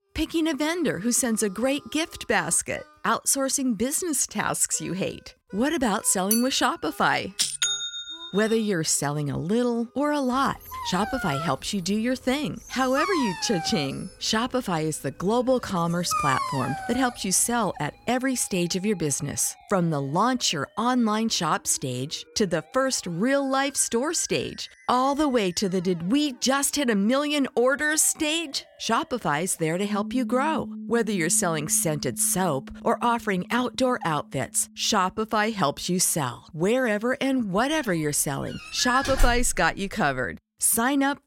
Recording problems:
background music; faint; throughout; 20 dB below the speech
clattering dishes; noticeable; at 6.5 s; peak 2 dB below the speech
dog barking; noticeable; from 11 to 17 s; peak 1 dB below the speech
door banging; noticeable; at 39 s; peak 2 dB below the speech

